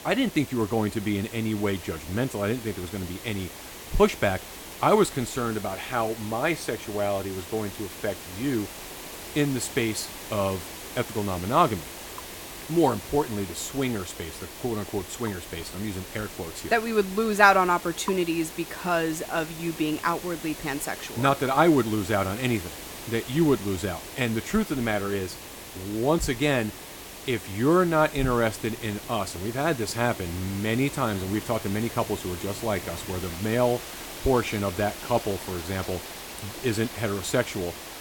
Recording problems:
rain or running water; noticeable; throughout; 20 dB below the speech
hiss; noticeable; throughout; 10 dB below the speech

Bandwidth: 17 kHz